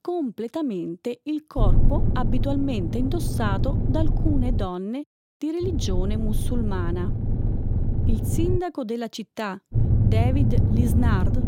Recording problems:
low rumble; loud; from 1.5 to 4.5 s, from 5.5 to 8.5 s and from 9.5 s on; 5 dB below the speech

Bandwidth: 16.5 kHz